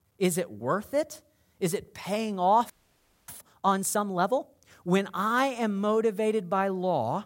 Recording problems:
audio freezing; at 2.5 s for 0.5 s

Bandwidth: 16 kHz